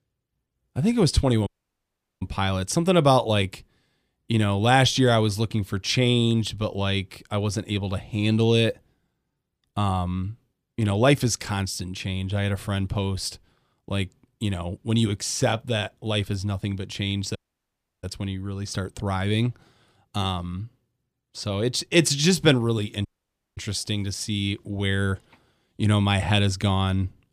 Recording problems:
audio cutting out; at 1.5 s for 0.5 s, at 17 s for 0.5 s and at 23 s for 0.5 s

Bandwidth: 15 kHz